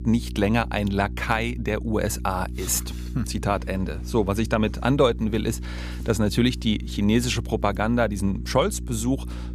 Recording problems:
electrical hum; faint; throughout; 60 Hz, 20 dB below the speech

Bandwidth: 15 kHz